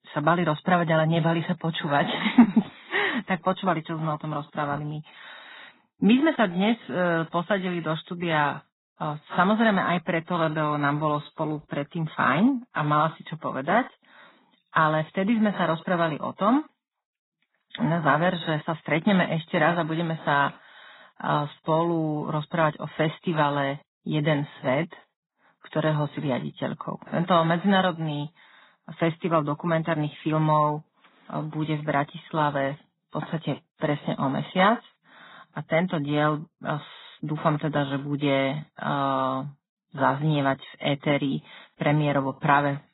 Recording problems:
garbled, watery; badly; nothing above 4 kHz

